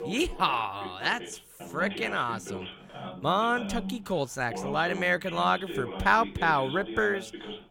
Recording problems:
voice in the background; noticeable; throughout; 10 dB below the speech

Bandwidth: 16.5 kHz